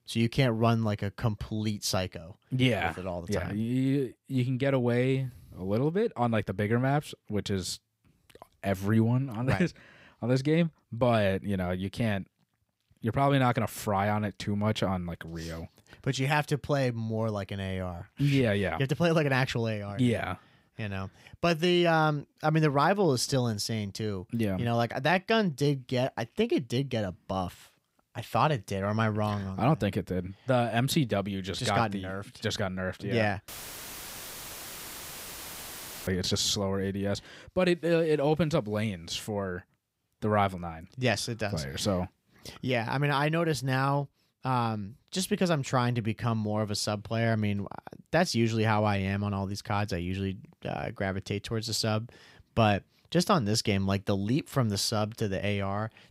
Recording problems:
audio cutting out; filled with static; at 33 s for 2.5 s

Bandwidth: 15.5 kHz